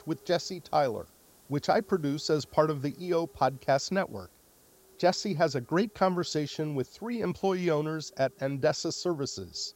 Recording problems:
high frequencies cut off; noticeable; nothing above 7.5 kHz
hiss; faint; throughout; 25 dB below the speech

